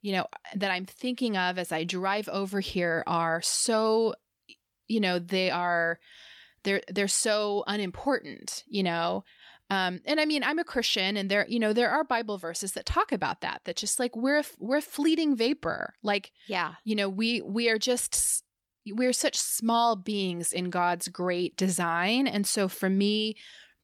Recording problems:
none

